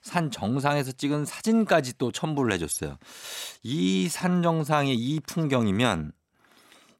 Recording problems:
none

